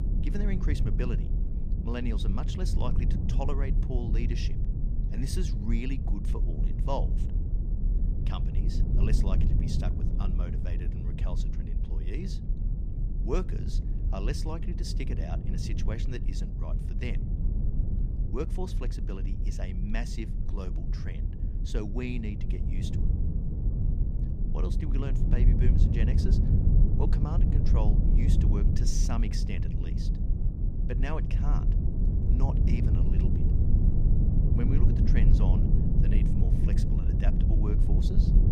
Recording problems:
low rumble; loud; throughout; 1 dB below the speech

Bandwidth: 15 kHz